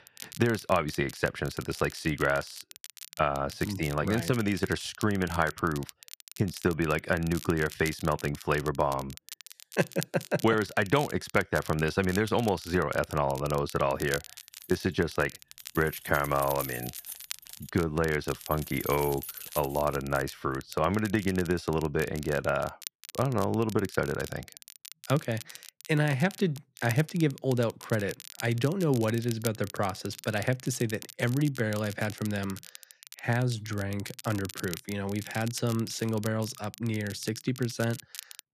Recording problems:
crackle, like an old record; noticeable; 15 dB below the speech
jangling keys; noticeable; from 15 to 20 s; peak 7 dB below the speech

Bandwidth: 14.5 kHz